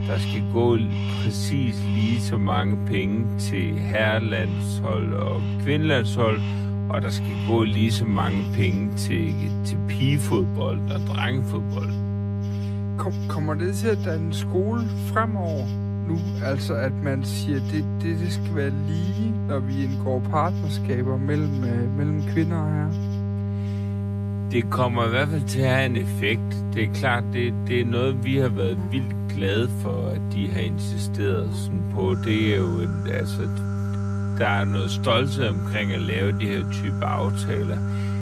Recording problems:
wrong speed, natural pitch; too slow; 0.6 times normal speed
electrical hum; loud; throughout; 50 Hz, 9 dB below the speech
animal sounds; noticeable; throughout; 20 dB below the speech

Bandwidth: 14.5 kHz